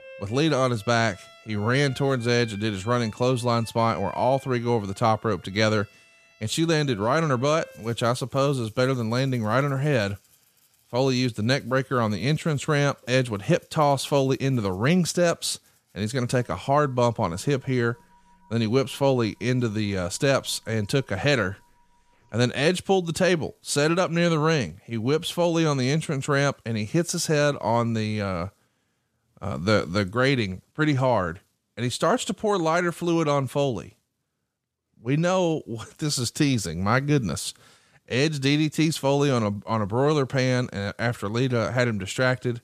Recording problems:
background music; faint; until 24 s; 25 dB below the speech

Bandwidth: 14.5 kHz